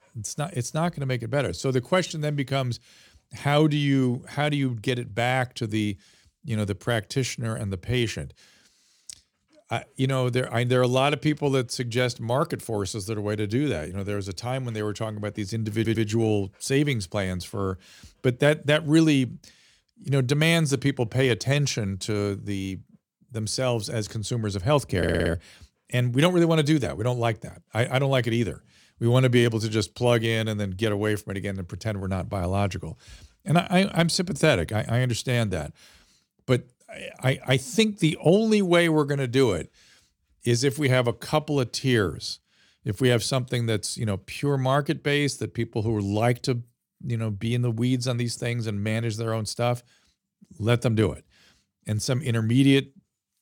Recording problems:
audio stuttering; at 16 s and at 25 s

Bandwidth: 17 kHz